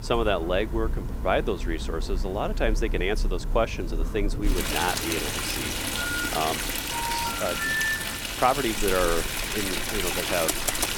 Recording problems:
rain or running water; loud; throughout; as loud as the speech
phone ringing; noticeable; at 6 s; peak 2 dB below the speech
phone ringing; loud; from 7 to 8 s; peak 4 dB above the speech
keyboard typing; loud; at 10 s; peak 1 dB above the speech

